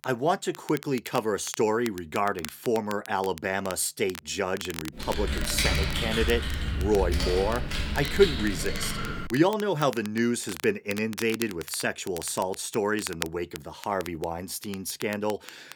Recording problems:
crackle, like an old record; noticeable; 15 dB below the speech
keyboard typing; loud; from 5 to 9.5 s; peak 3 dB above the speech

